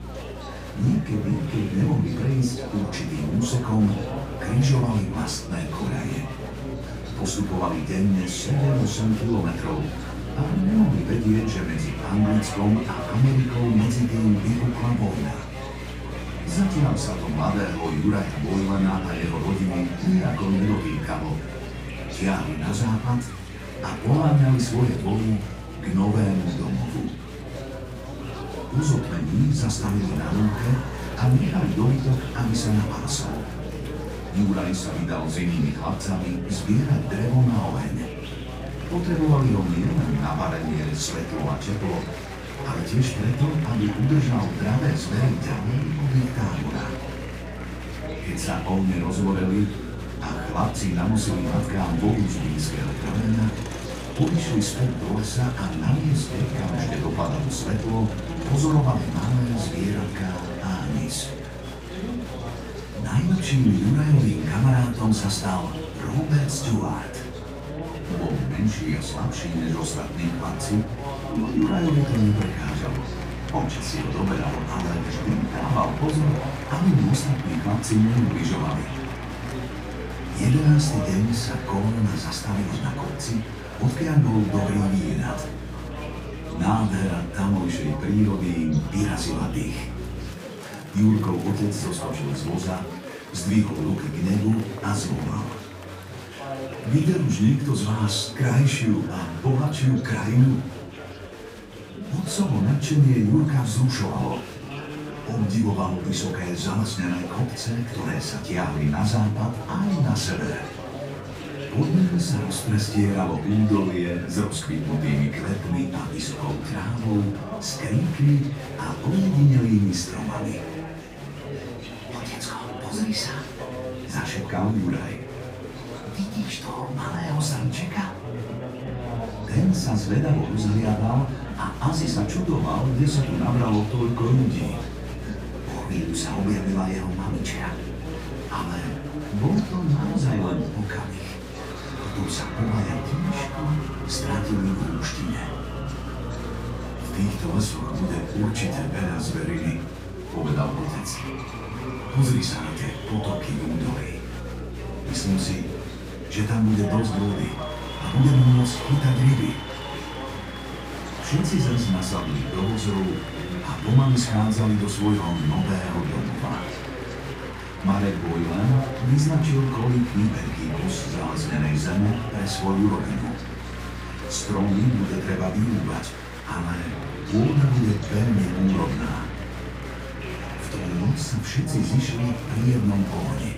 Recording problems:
off-mic speech; far
room echo; slight; dies away in 0.4 s
electrical hum; noticeable; until 1:30 and from 2:09 on; 60 Hz, 20 dB below the speech
chatter from many people; noticeable; throughout; 10 dB below the speech

